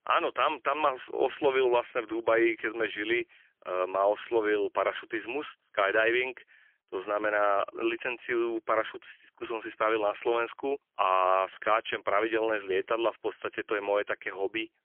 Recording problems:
phone-call audio; poor line; nothing above 3.5 kHz

